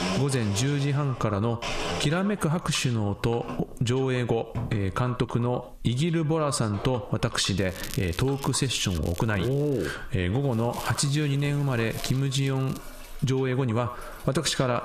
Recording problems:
squashed, flat; heavily, background pumping
echo of what is said; noticeable; throughout; 90 ms later, 15 dB below the speech
household noises; noticeable; throughout; 10 dB below the speech
crackling; noticeable; from 7.5 to 10 s and from 11 to 13 s; 15 dB below the speech

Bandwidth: 14.5 kHz